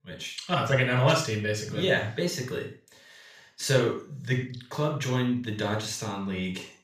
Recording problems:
off-mic speech; far
room echo; noticeable; dies away in 0.3 s

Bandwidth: 15 kHz